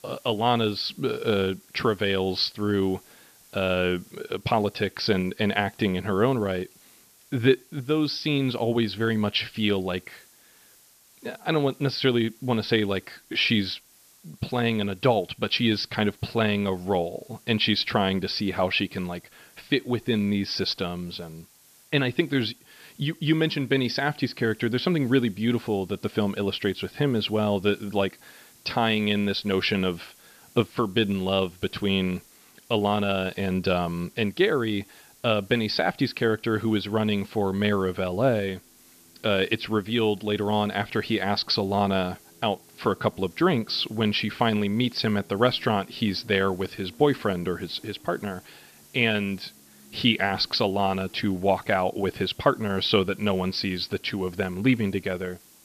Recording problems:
high frequencies cut off; noticeable; nothing above 5.5 kHz
hiss; faint; throughout; 25 dB below the speech

